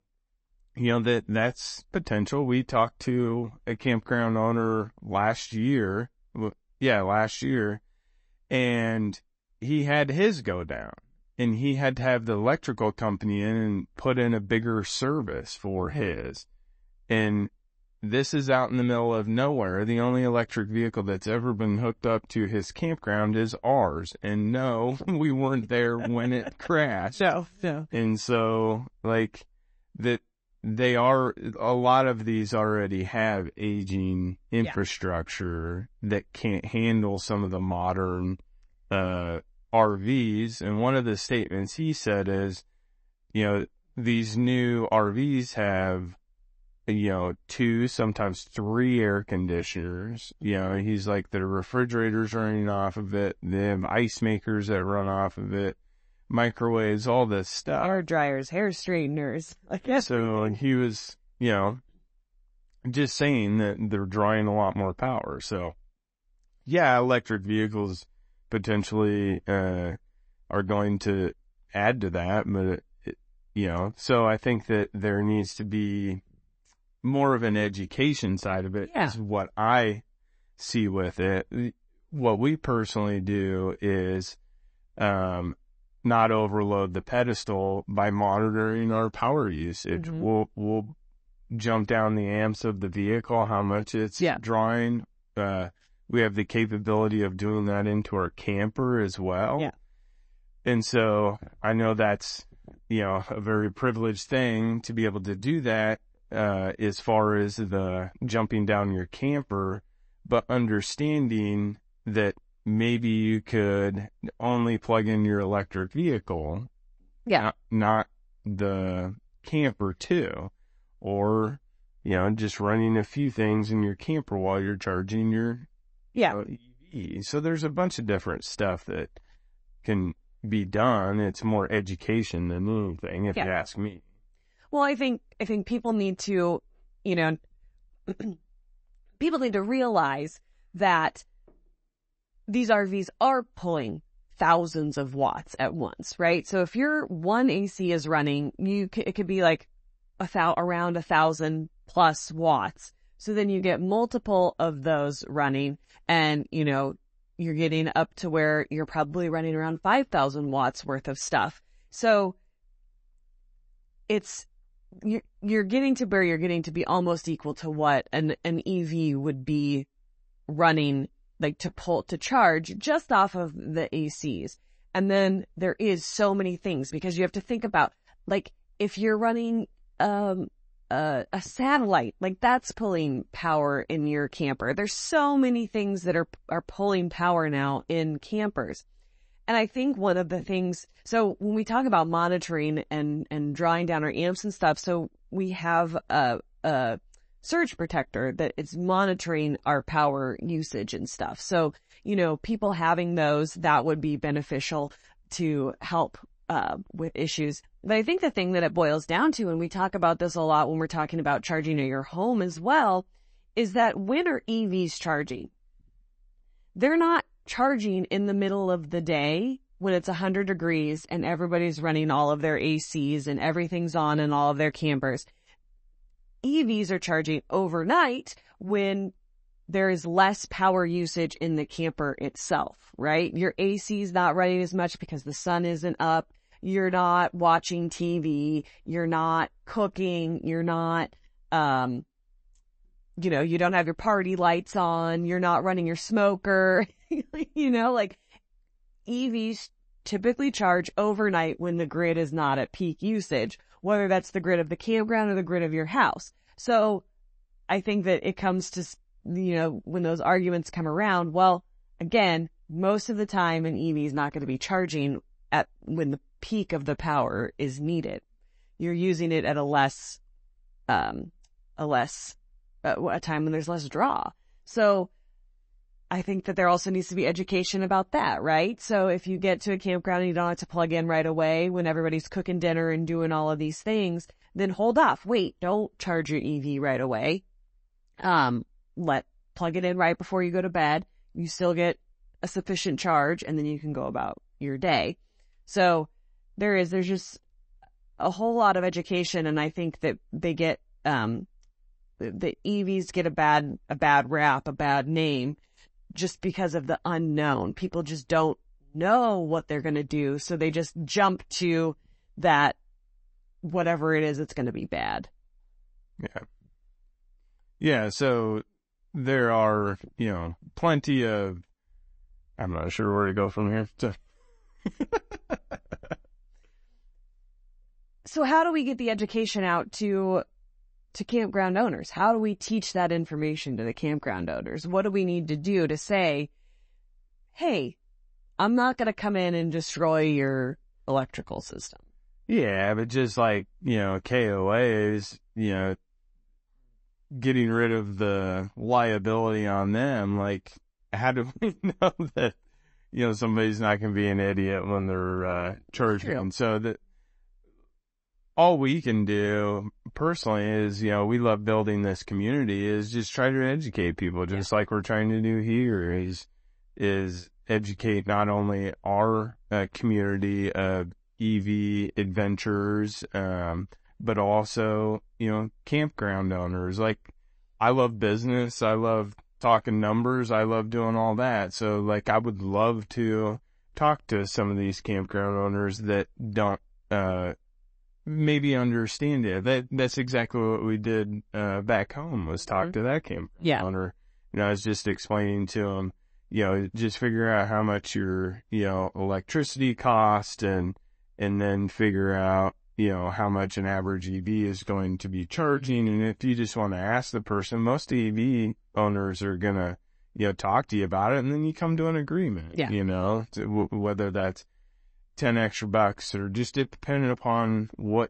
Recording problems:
garbled, watery; slightly; nothing above 8 kHz

